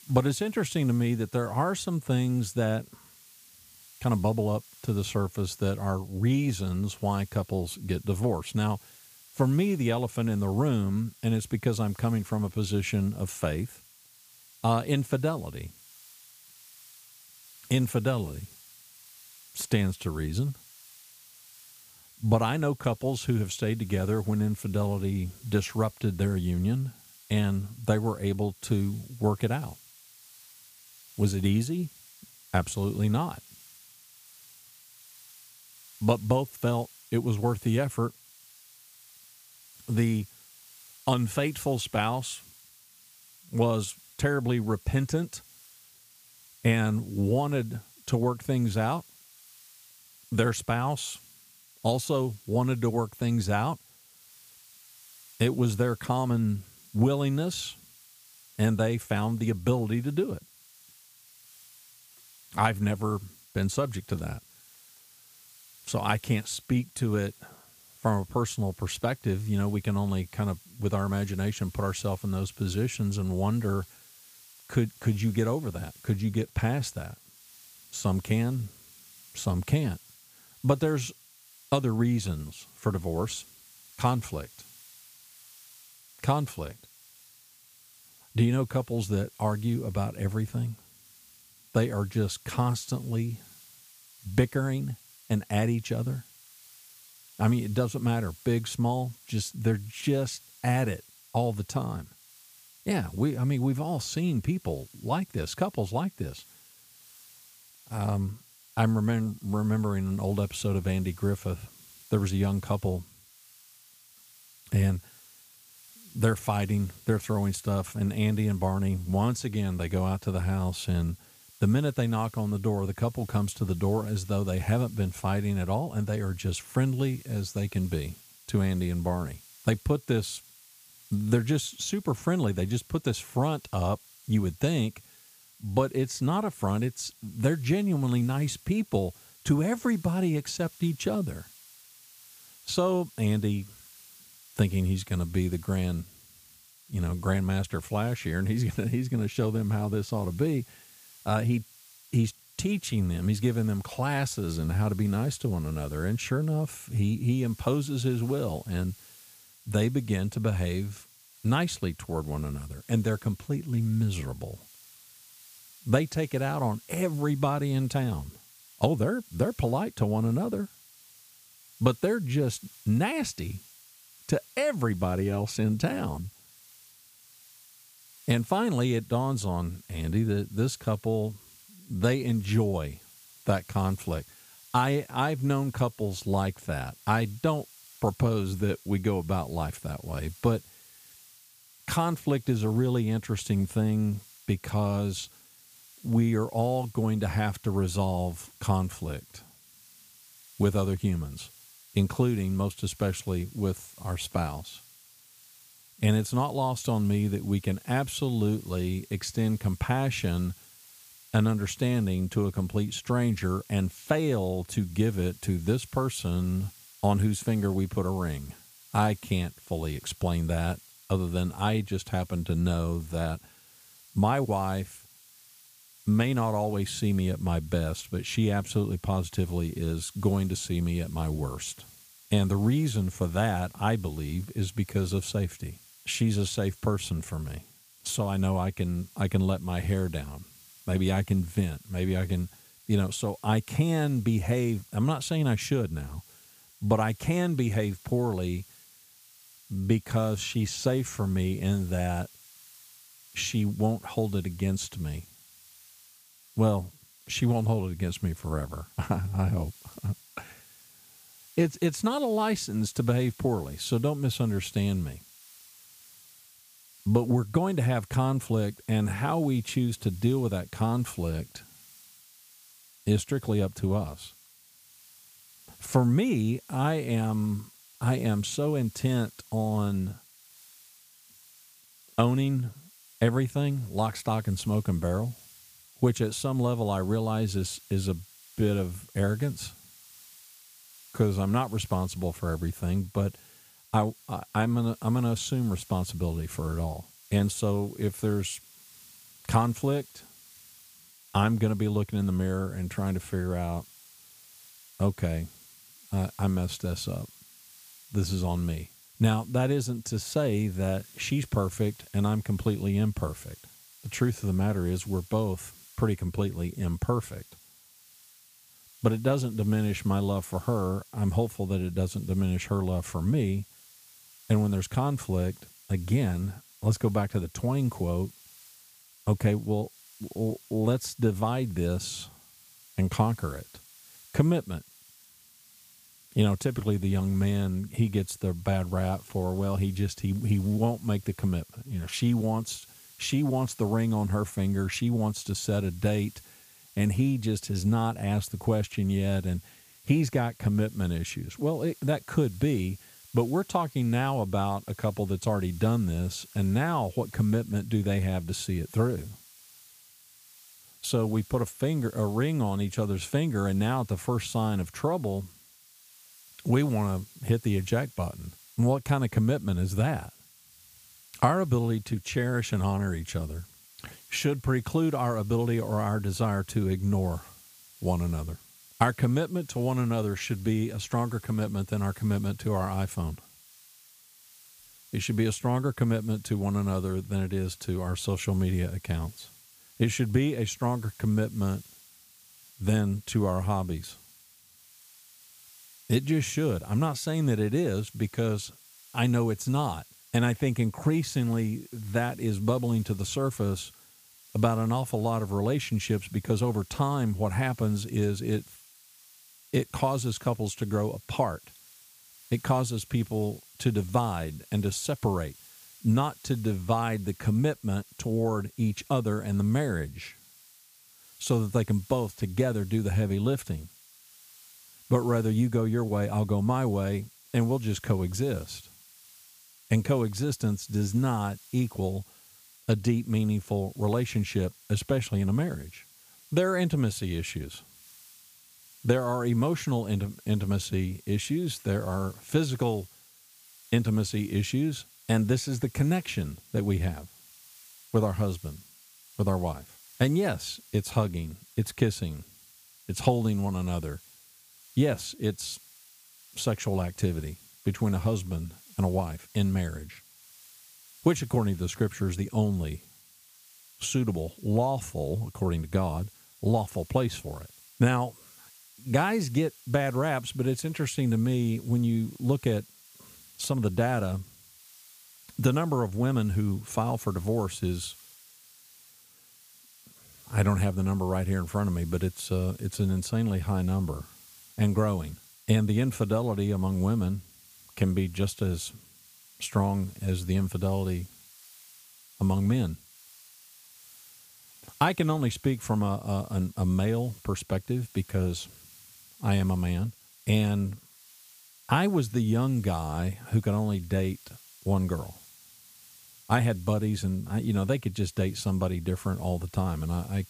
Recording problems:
hiss; faint; throughout; 25 dB below the speech

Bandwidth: 15 kHz